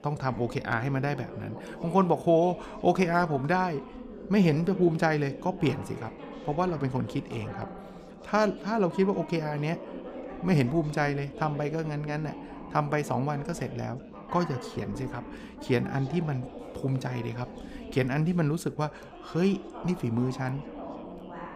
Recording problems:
background chatter; noticeable; throughout; 3 voices, 15 dB below the speech

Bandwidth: 15.5 kHz